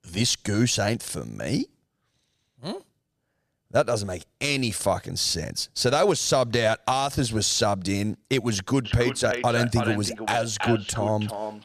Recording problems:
echo of what is said; strong; from 9 s on; 330 ms later, 8 dB below the speech

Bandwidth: 14.5 kHz